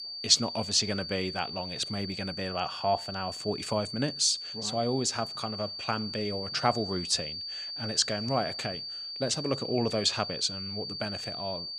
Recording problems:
high-pitched whine; loud; throughout; 4.5 kHz, 6 dB below the speech

